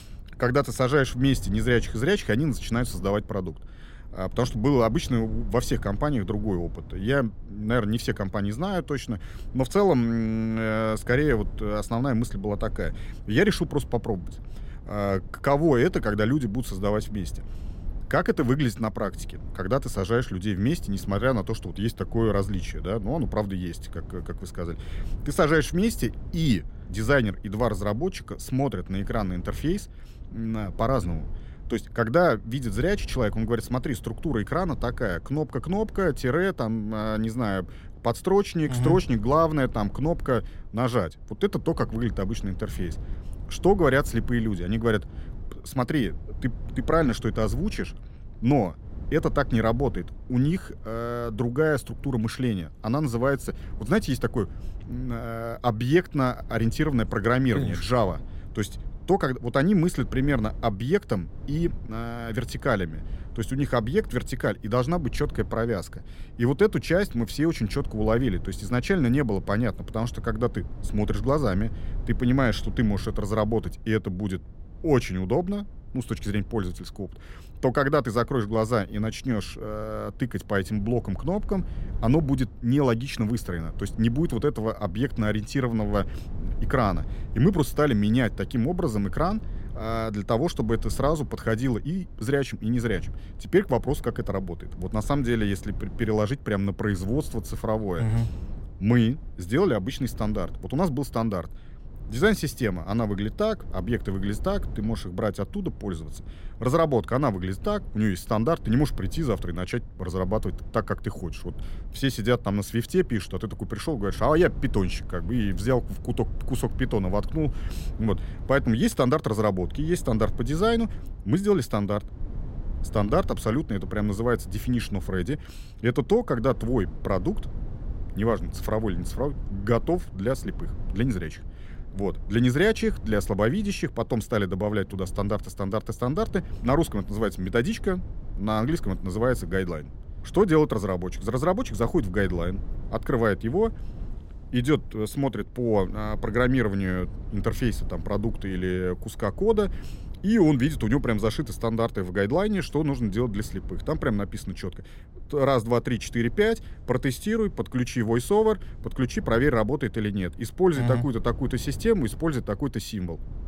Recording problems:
low rumble; faint; throughout; 25 dB below the speech

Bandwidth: 16 kHz